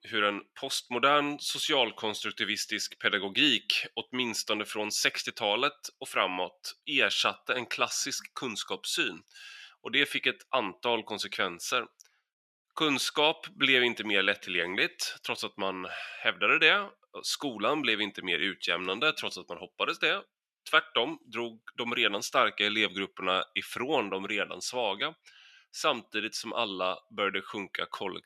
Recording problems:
thin; somewhat; fading below 700 Hz

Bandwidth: 13.5 kHz